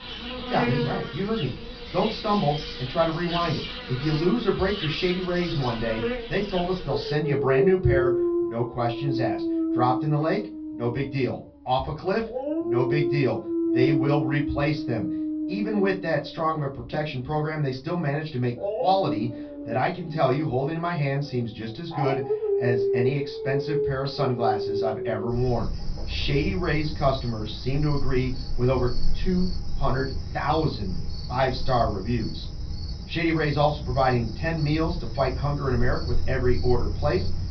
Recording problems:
off-mic speech; far
high frequencies cut off; noticeable; nothing above 5.5 kHz
room echo; very slight; dies away in 0.2 s
animal sounds; loud; throughout; 4 dB below the speech

